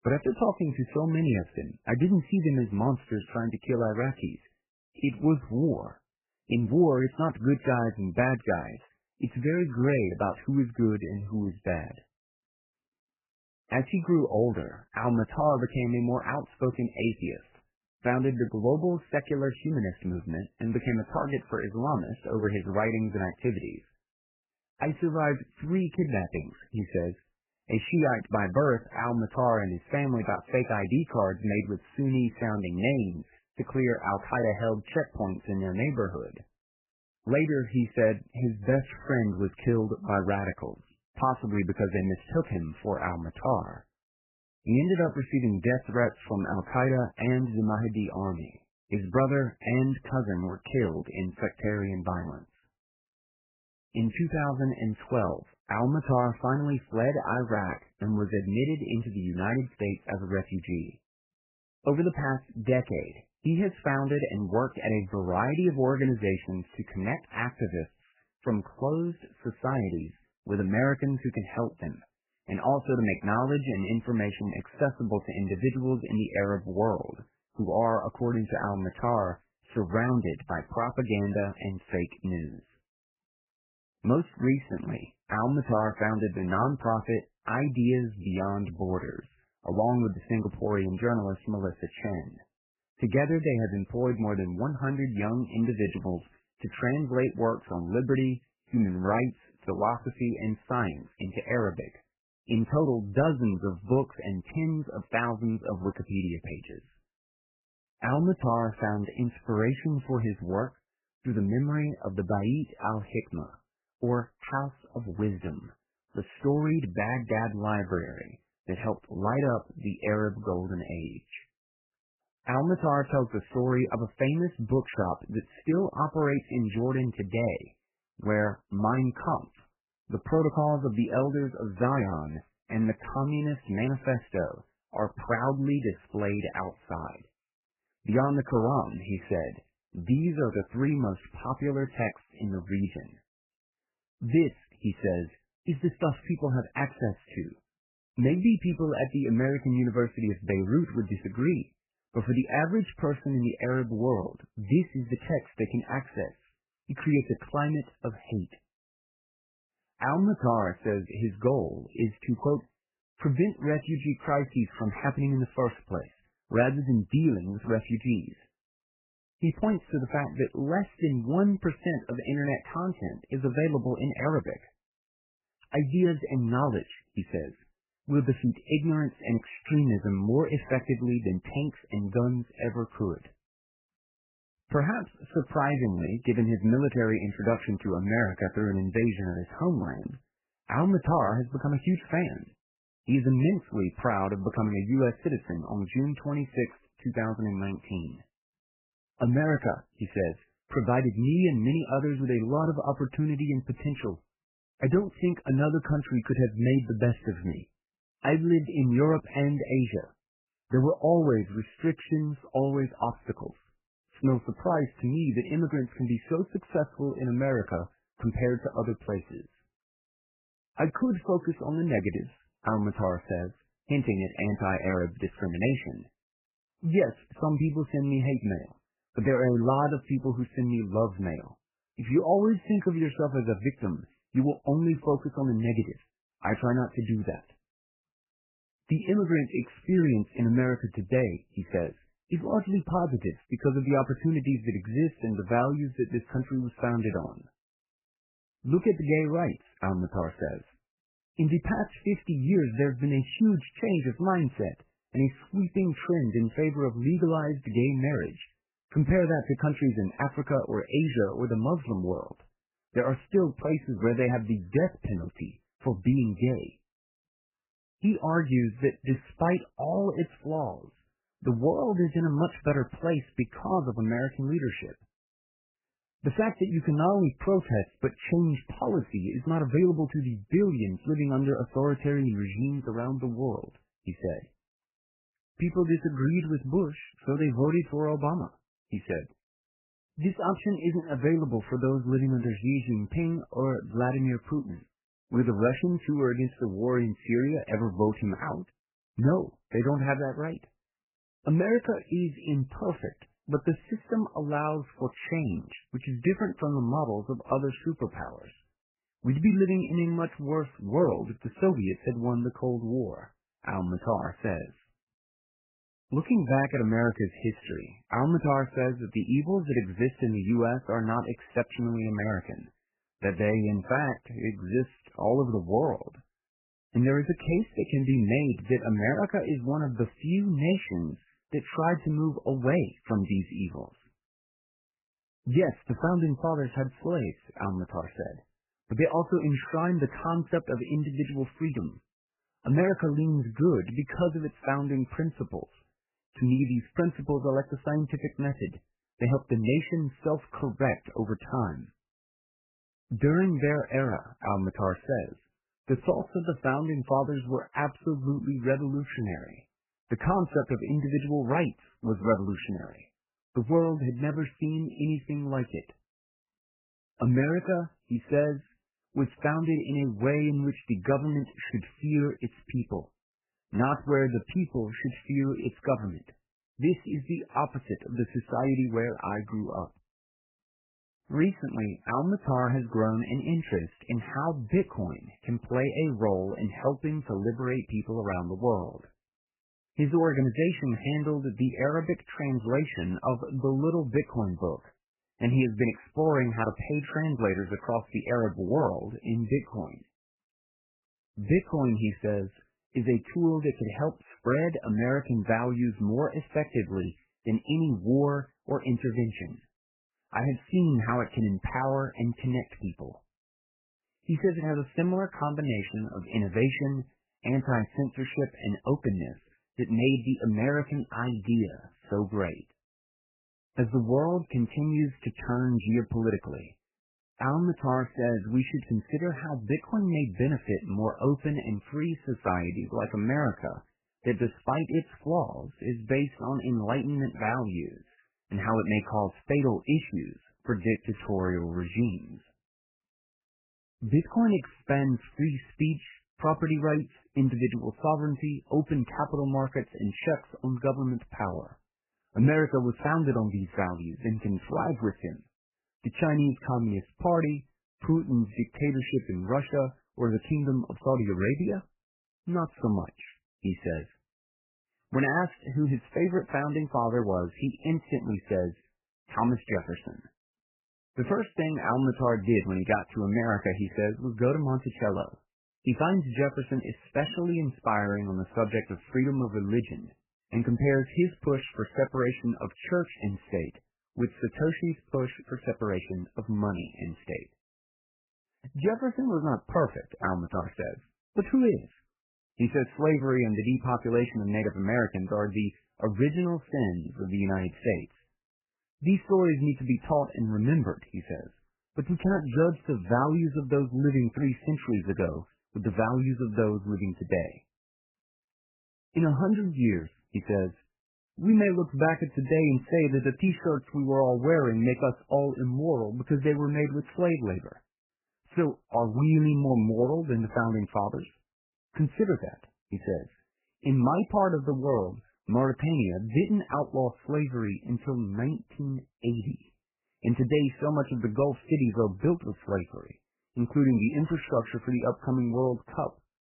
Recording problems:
garbled, watery; badly; nothing above 3 kHz
uneven, jittery; strongly; from 5 s to 8:14

